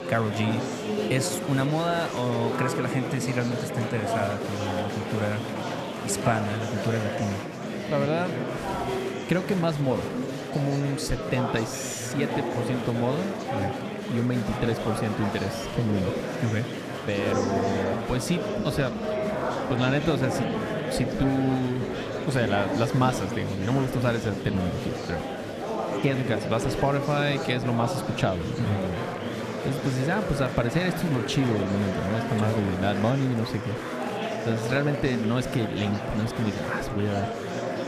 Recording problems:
murmuring crowd; loud; throughout; 2 dB below the speech

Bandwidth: 14.5 kHz